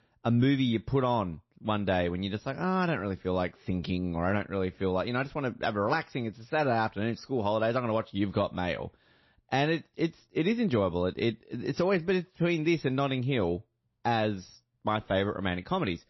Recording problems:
garbled, watery; slightly; nothing above 5.5 kHz

